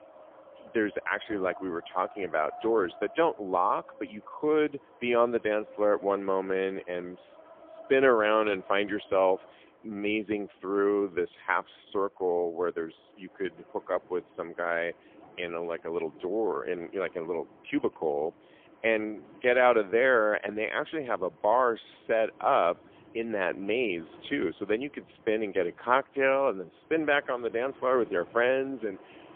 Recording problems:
phone-call audio; poor line; nothing above 3.5 kHz
wind in the background; faint; throughout; 25 dB below the speech

